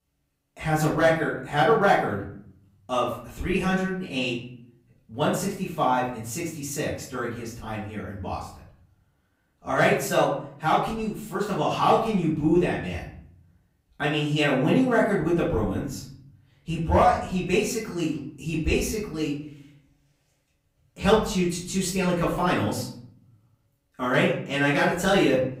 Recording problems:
off-mic speech; far
room echo; noticeable; dies away in 0.6 s

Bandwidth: 15.5 kHz